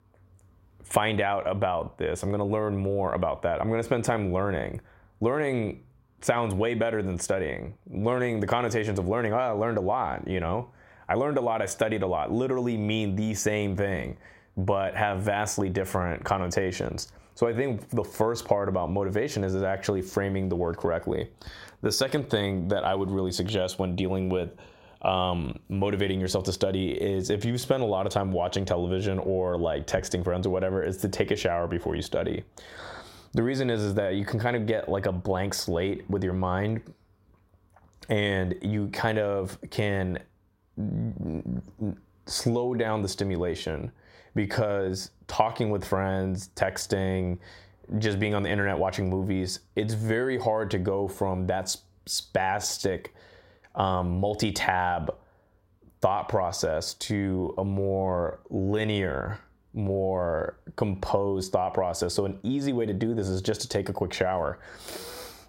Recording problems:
squashed, flat; heavily

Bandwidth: 16 kHz